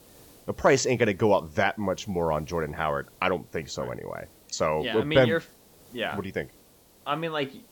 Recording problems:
high frequencies cut off; noticeable; nothing above 8 kHz
hiss; faint; throughout; 25 dB below the speech

